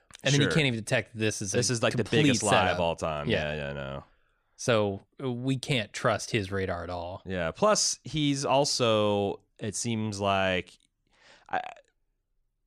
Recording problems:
none

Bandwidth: 15 kHz